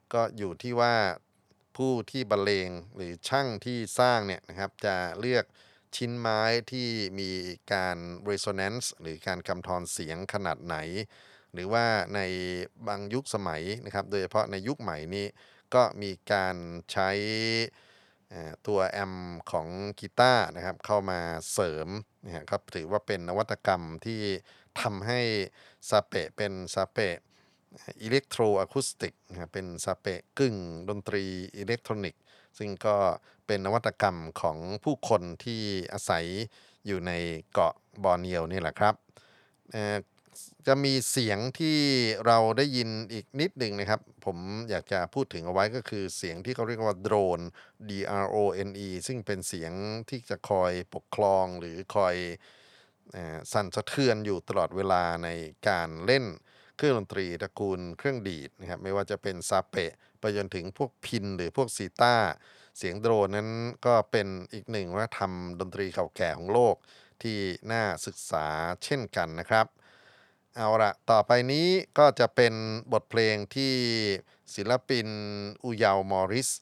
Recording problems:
none

